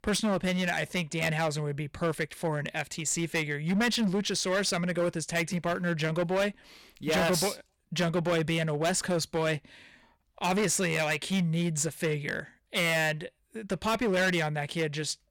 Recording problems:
distortion; heavy; 11% of the sound clipped

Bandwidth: 18 kHz